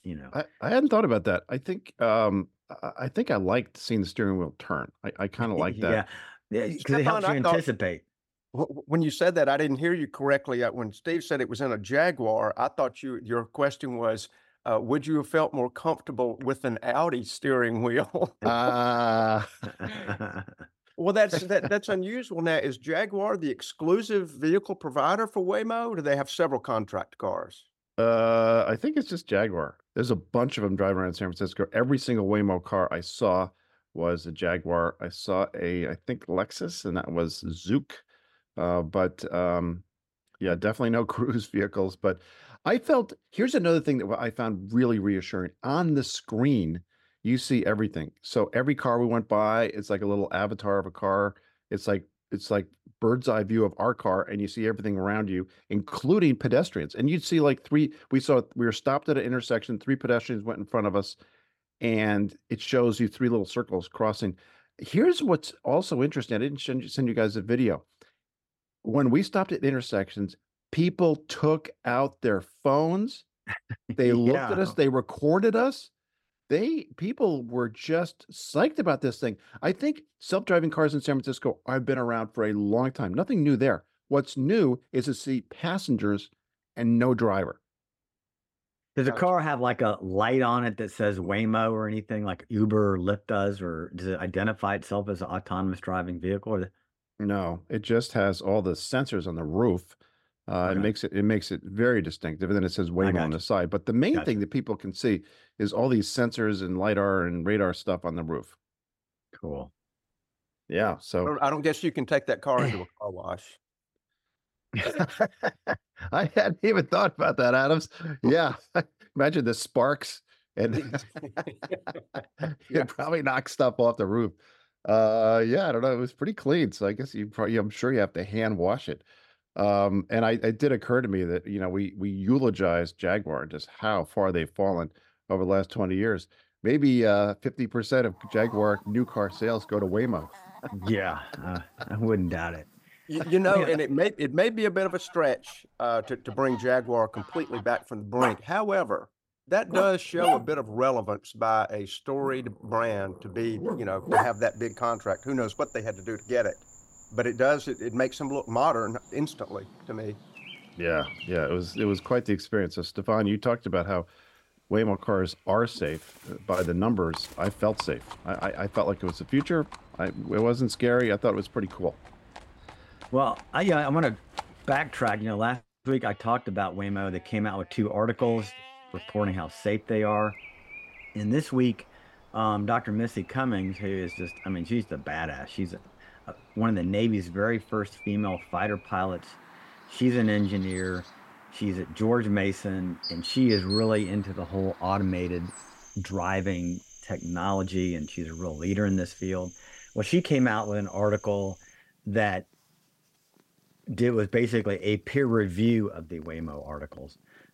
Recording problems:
animal sounds; noticeable; from 2:18 on; 10 dB below the speech

